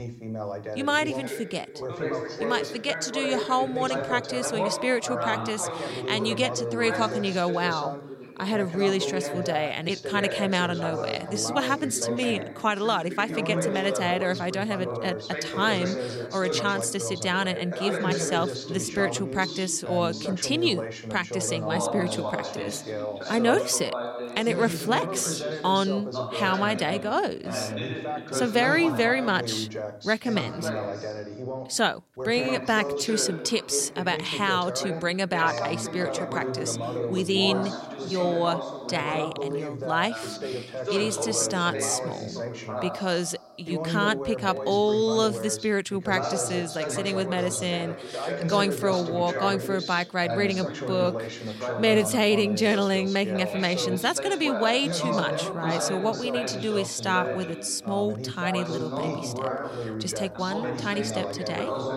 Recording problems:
background chatter; loud; throughout; 2 voices, 5 dB below the speech

